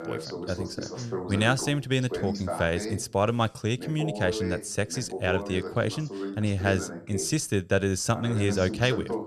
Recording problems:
voice in the background; loud; throughout; 8 dB below the speech

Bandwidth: 13.5 kHz